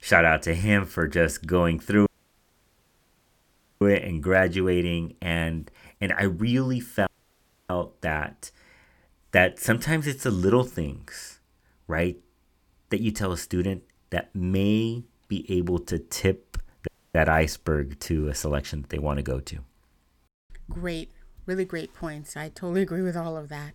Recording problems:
audio cutting out; at 2 s for 2 s, at 7 s for 0.5 s and at 17 s

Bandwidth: 17.5 kHz